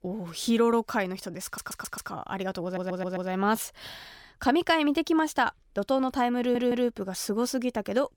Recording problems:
audio stuttering; at 1.5 s, at 2.5 s and at 6.5 s

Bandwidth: 18 kHz